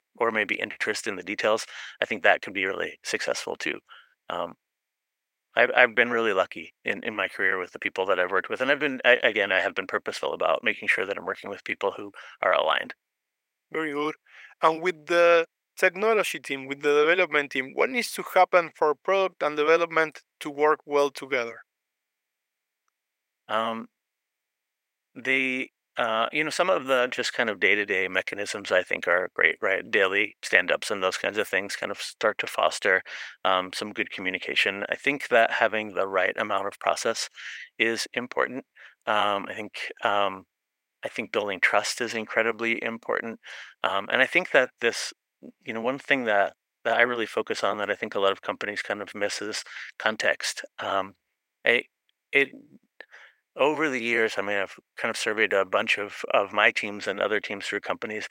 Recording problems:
thin; very; fading below 600 Hz

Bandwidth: 16 kHz